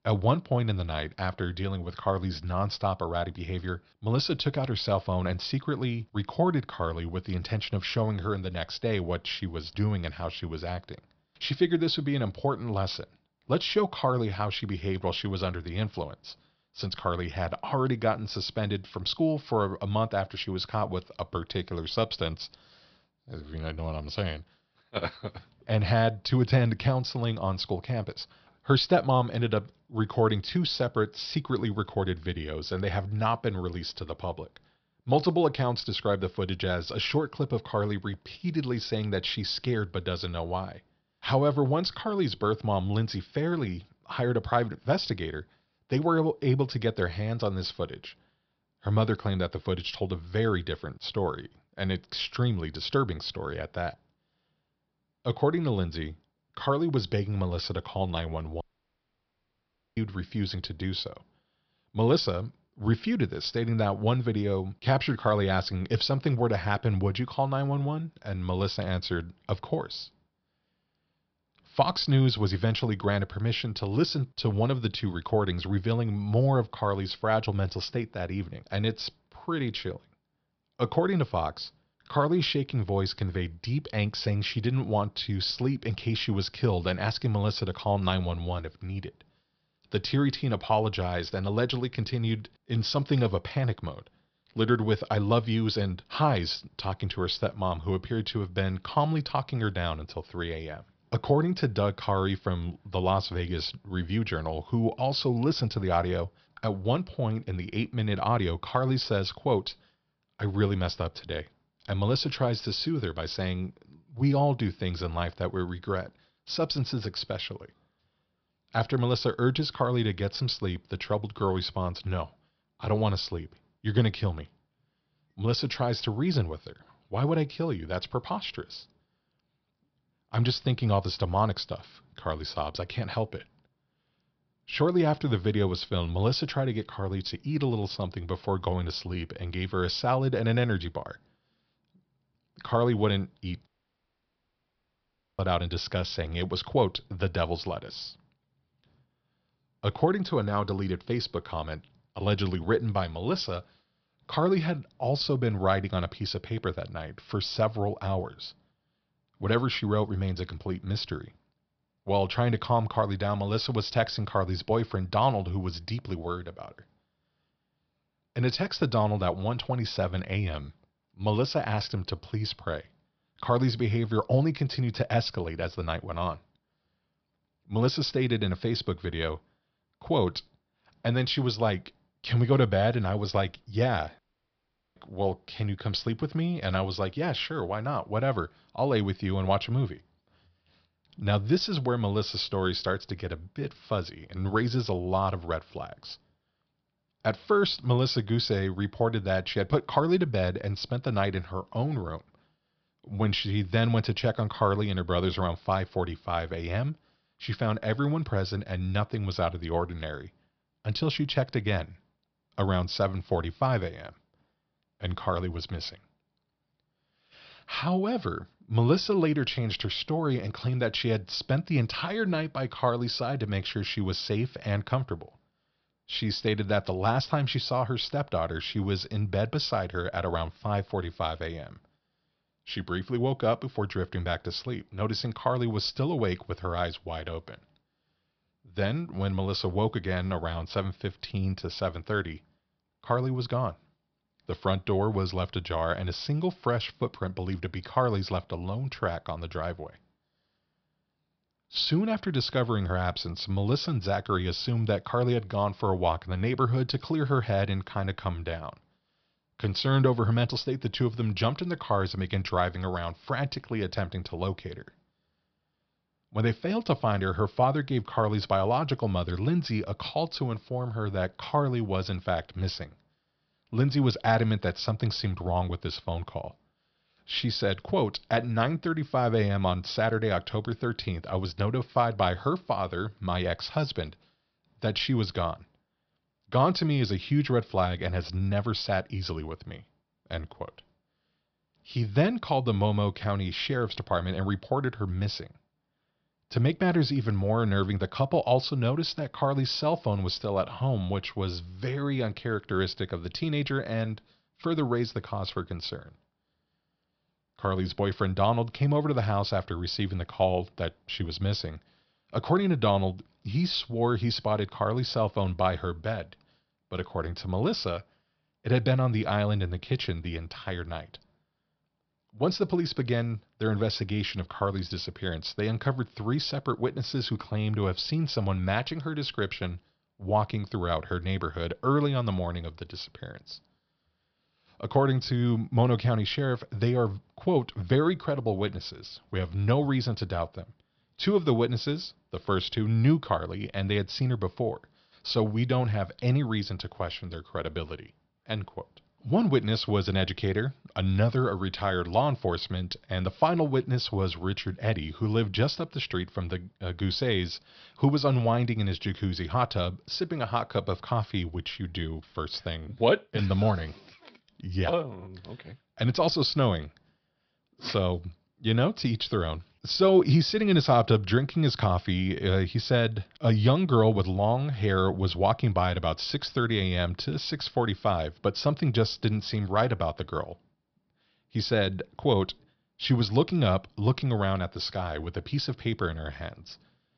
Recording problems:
high frequencies cut off; noticeable; nothing above 5.5 kHz
audio cutting out; at 59 s for 1.5 s, at 2:24 for 1.5 s and at 3:04 for 1 s

